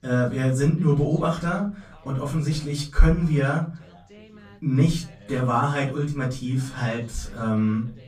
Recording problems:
off-mic speech; far
room echo; slight; dies away in 0.3 s
background chatter; faint; throughout; 2 voices, 25 dB below the speech

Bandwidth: 15.5 kHz